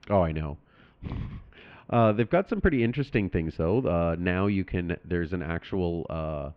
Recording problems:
muffled; very; fading above 2.5 kHz

